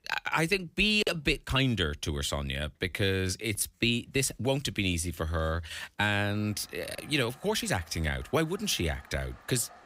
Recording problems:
household noises; faint; throughout; 25 dB below the speech
uneven, jittery; strongly; from 1 to 8.5 s

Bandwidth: 15.5 kHz